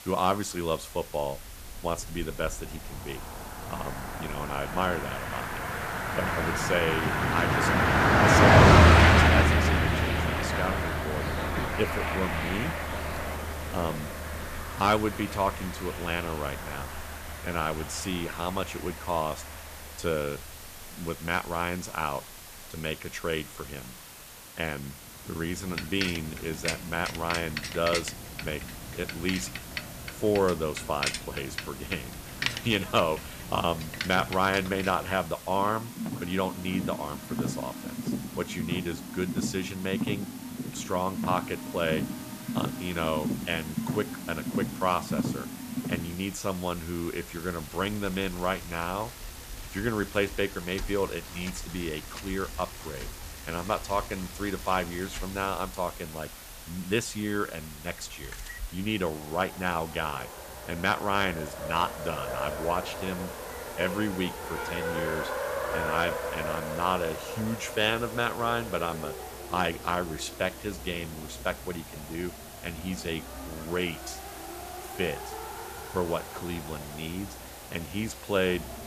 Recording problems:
traffic noise; very loud; throughout; 2 dB above the speech
hiss; noticeable; throughout; 10 dB below the speech

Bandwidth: 14.5 kHz